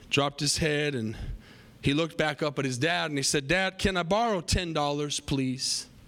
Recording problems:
squashed, flat; heavily

